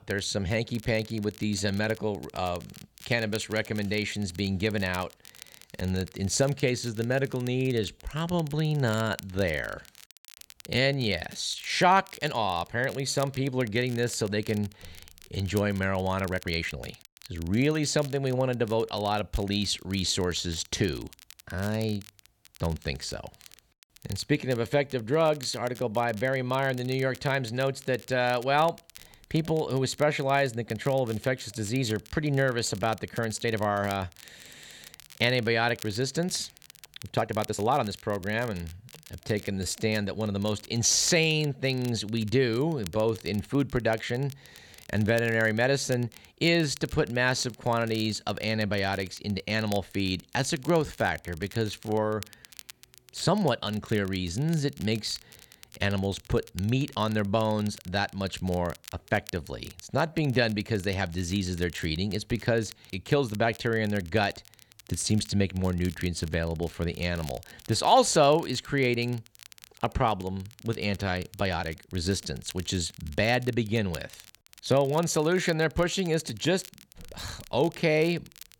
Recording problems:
crackle, like an old record; faint; 20 dB below the speech
uneven, jittery; strongly; from 8 s to 1:12

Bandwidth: 18 kHz